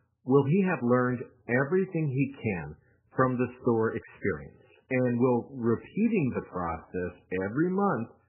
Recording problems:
garbled, watery; badly; nothing above 2.5 kHz
uneven, jittery; strongly; from 1.5 to 7 s

